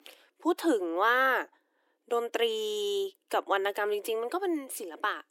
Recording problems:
thin; very; fading below 300 Hz

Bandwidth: 16.5 kHz